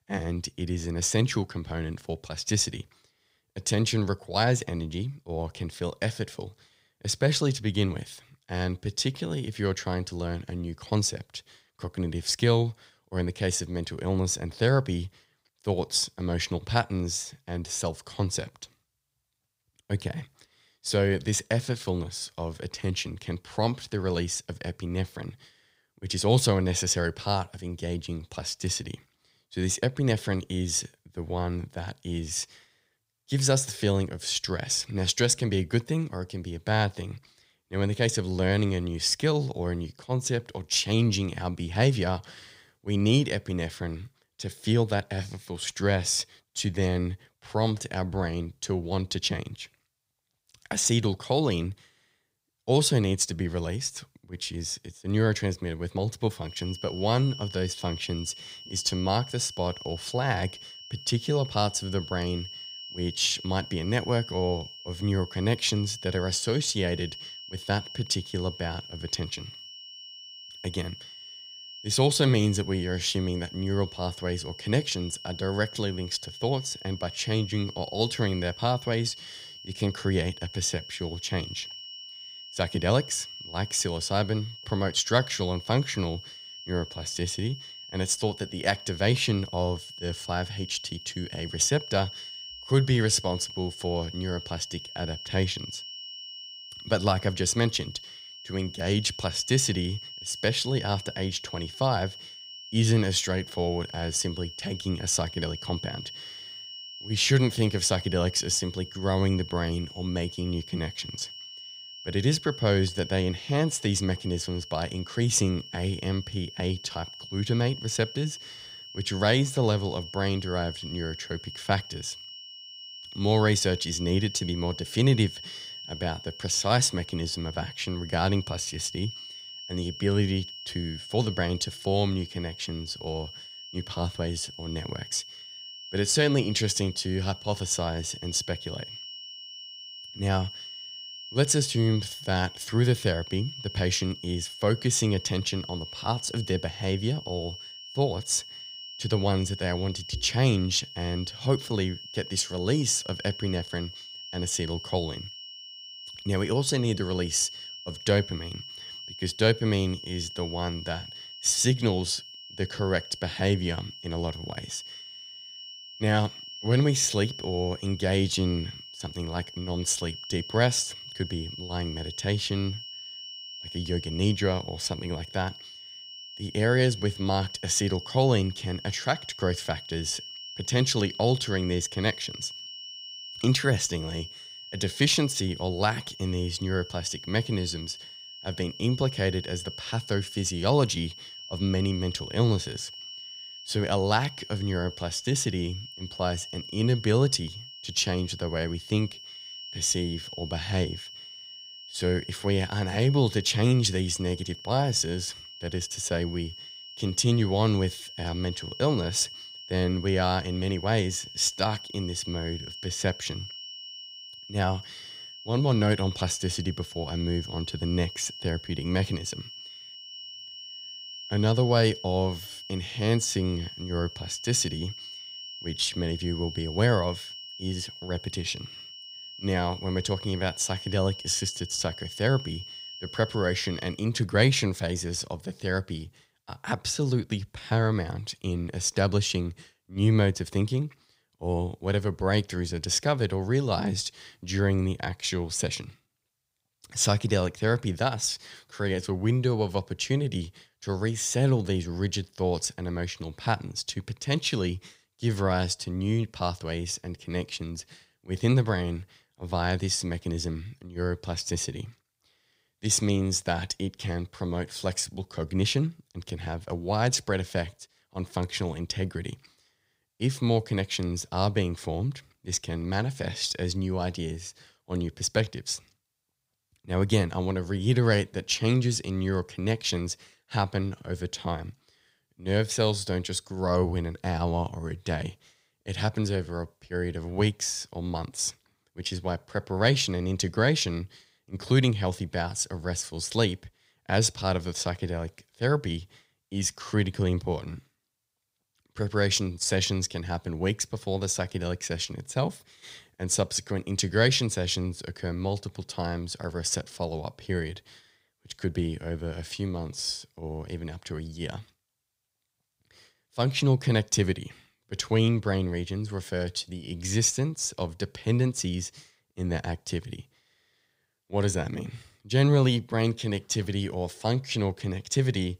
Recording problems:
high-pitched whine; noticeable; from 56 s to 3:54; 3 kHz, 10 dB below the speech

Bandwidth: 15.5 kHz